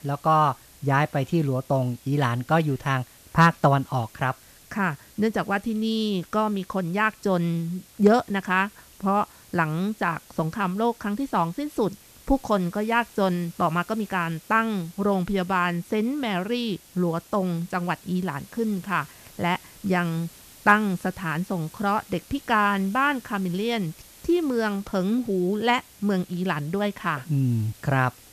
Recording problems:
hiss; faint; throughout; 25 dB below the speech

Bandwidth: 14.5 kHz